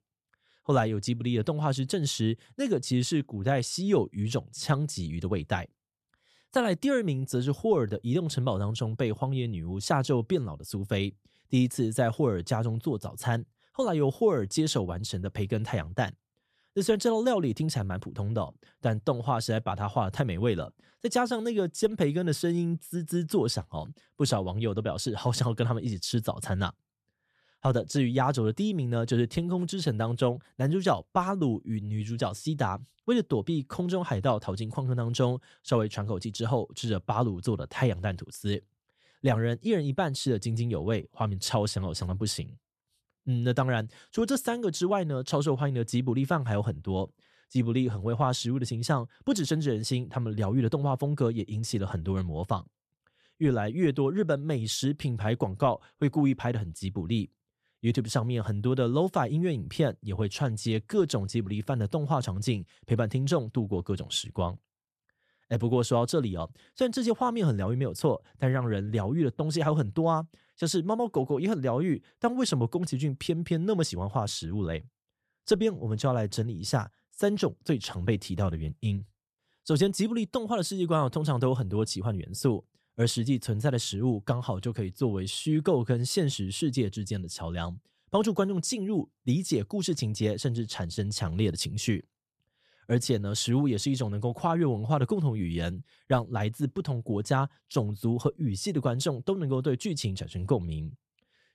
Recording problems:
none

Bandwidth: 14 kHz